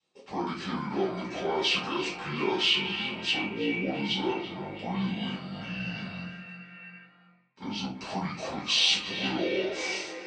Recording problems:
echo of what is said; strong; throughout; 330 ms later, 8 dB below the speech
off-mic speech; far
wrong speed and pitch; too slow and too low; 0.6 times normal speed
room echo; noticeable; dies away in 0.4 s
thin; very slightly; fading below 300 Hz

